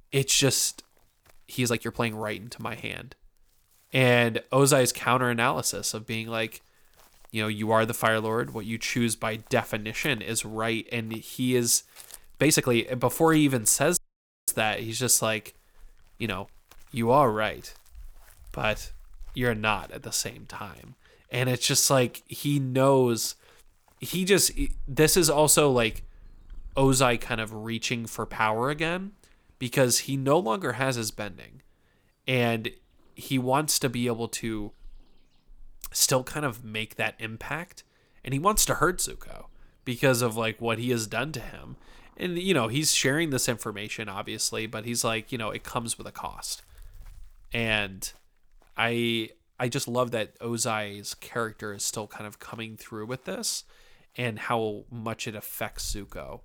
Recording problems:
animal sounds; faint; throughout; 25 dB below the speech
uneven, jittery; strongly; from 1.5 to 55 s
audio cutting out; at 14 s for 0.5 s

